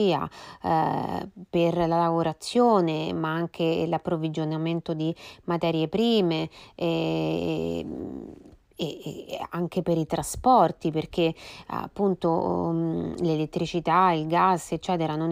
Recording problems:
abrupt cut into speech; at the start and the end

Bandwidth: 15.5 kHz